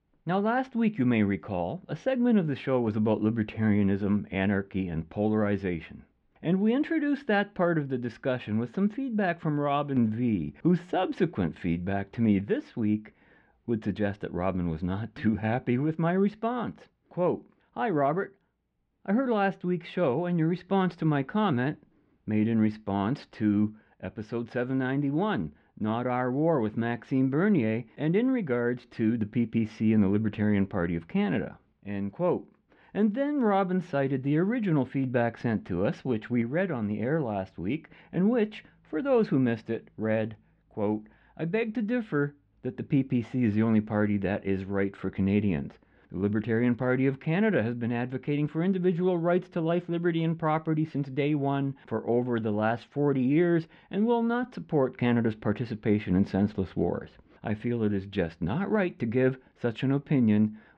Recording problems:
muffled; slightly; fading above 3 kHz

